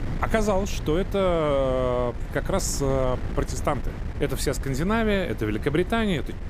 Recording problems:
wind noise on the microphone; occasional gusts; 15 dB below the speech

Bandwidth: 15 kHz